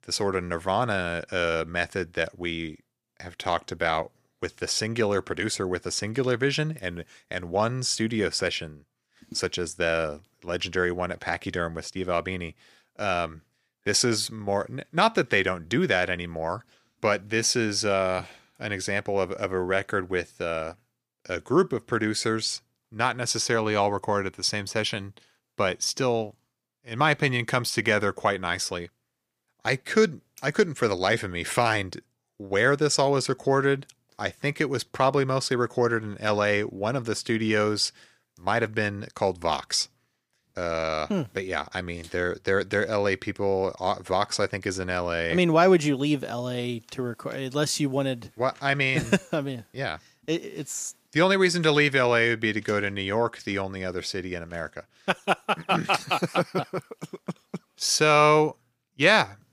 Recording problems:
none

